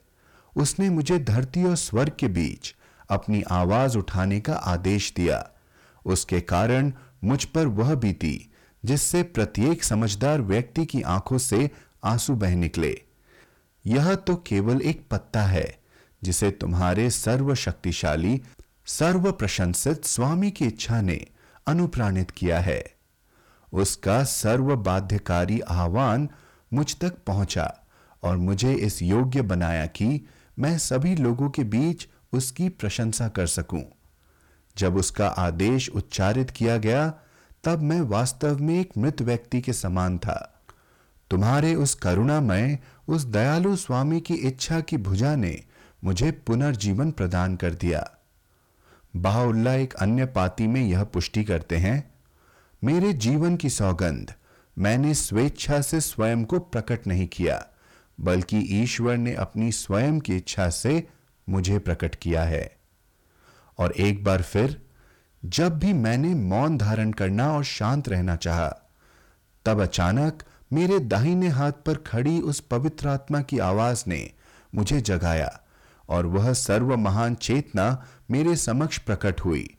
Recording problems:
distortion; slight; 10 dB below the speech

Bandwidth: 18.5 kHz